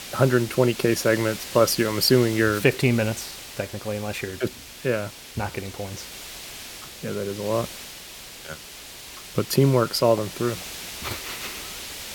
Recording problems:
hiss; noticeable; throughout; 10 dB below the speech

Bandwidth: 17 kHz